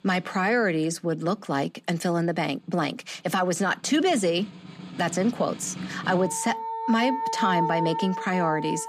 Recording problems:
background music; loud; throughout; 6 dB below the speech

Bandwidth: 15 kHz